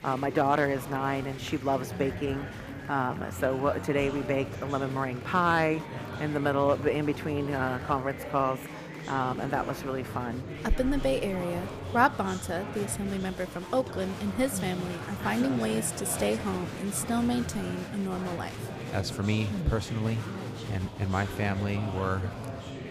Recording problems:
murmuring crowd; loud; throughout; 8 dB below the speech

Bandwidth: 15 kHz